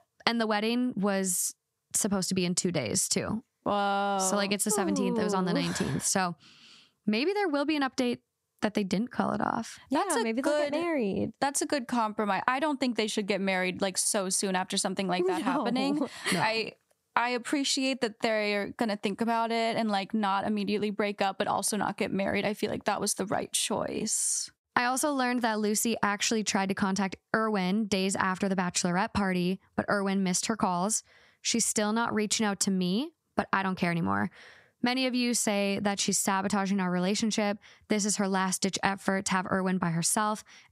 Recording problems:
squashed, flat; somewhat

